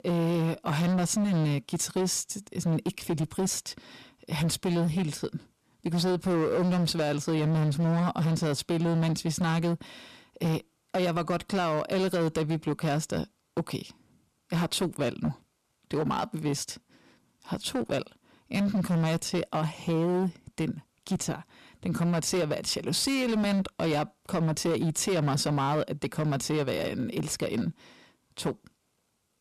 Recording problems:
distortion; slight; 16% of the sound clipped

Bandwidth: 13.5 kHz